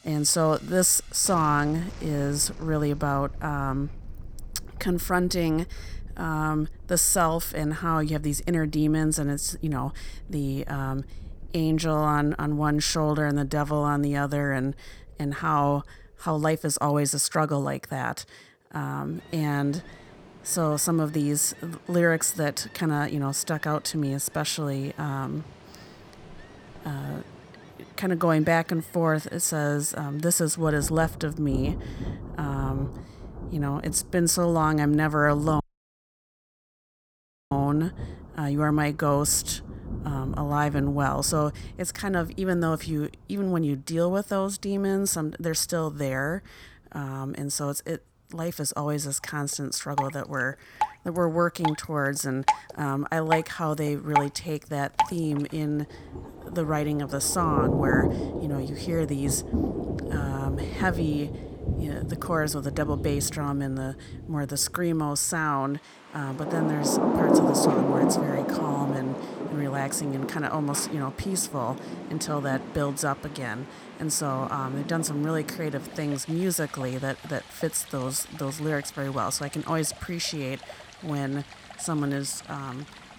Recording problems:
rain or running water; loud; throughout; 6 dB below the speech
audio cutting out; at 36 s for 2 s

